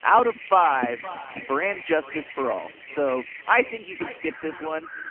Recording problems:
phone-call audio; poor line; nothing above 3 kHz
echo of what is said; noticeable; throughout; 520 ms later, 15 dB below the speech
animal sounds; noticeable; throughout; 15 dB below the speech

